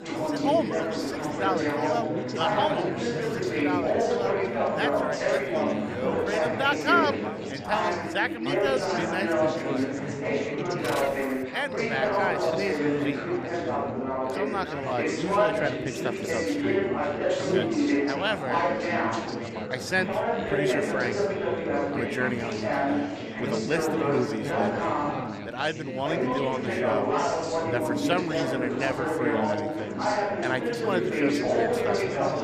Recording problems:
chatter from many people; very loud; throughout; 4 dB above the speech

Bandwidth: 15 kHz